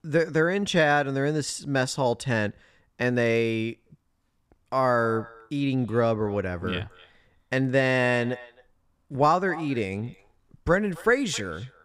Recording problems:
echo of what is said; faint; from 4.5 s on; 260 ms later, 20 dB below the speech

